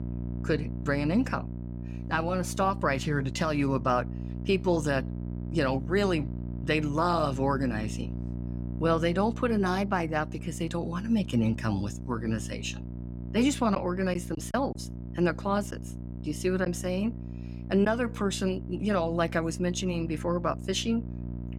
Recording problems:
electrical hum; noticeable; throughout; 60 Hz, 15 dB below the speech
choppy; occasionally; from 14 to 18 s; 4% of the speech affected

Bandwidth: 16.5 kHz